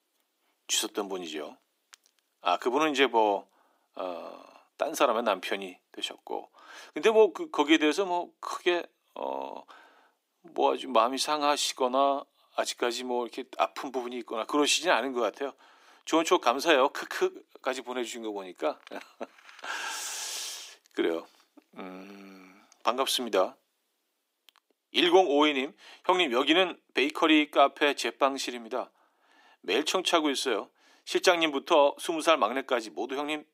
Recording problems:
thin; somewhat; fading below 300 Hz

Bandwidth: 15.5 kHz